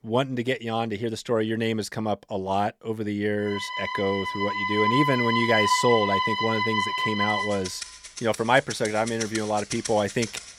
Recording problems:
background music; loud; from 3.5 s on; 1 dB below the speech

